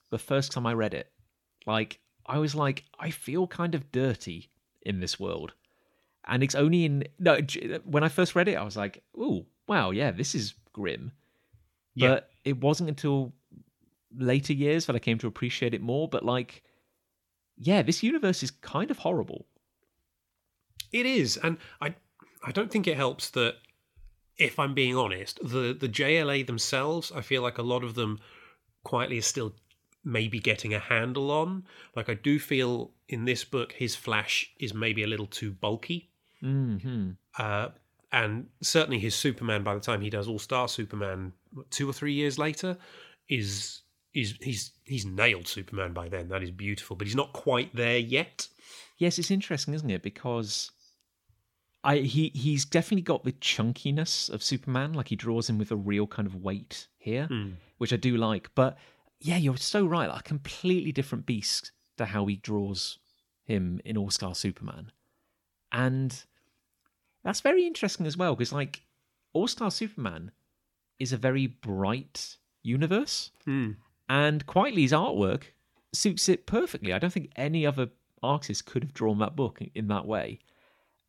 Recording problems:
none

